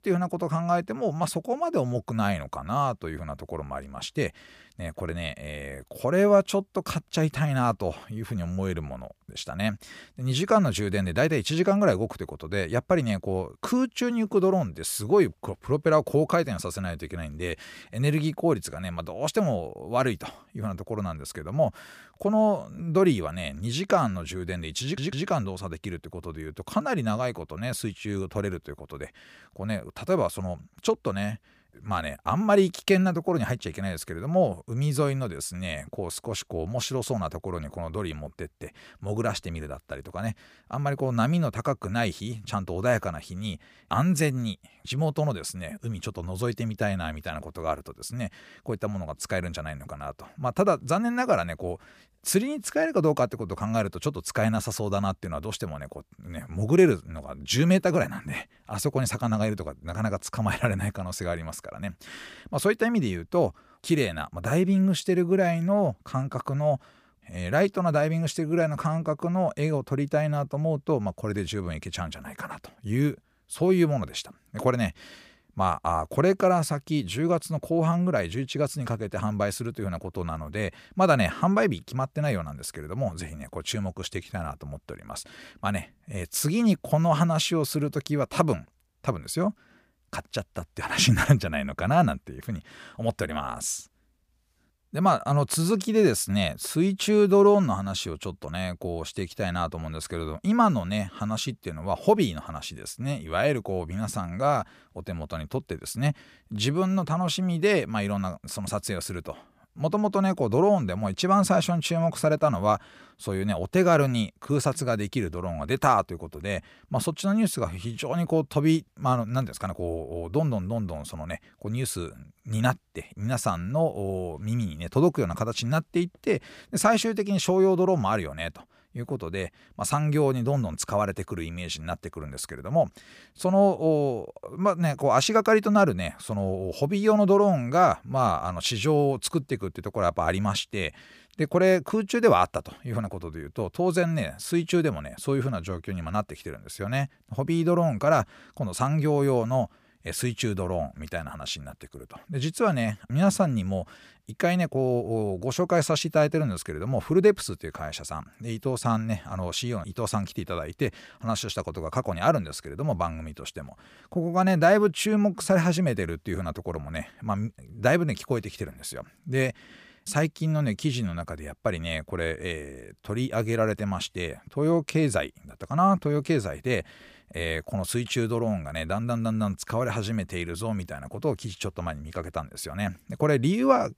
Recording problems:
audio stuttering; at 25 s

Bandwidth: 15 kHz